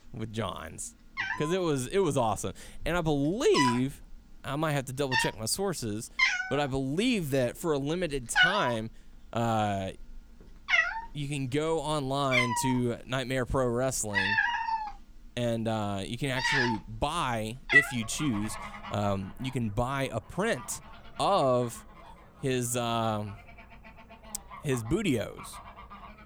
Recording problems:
animal sounds; very loud; throughout; 2 dB above the speech

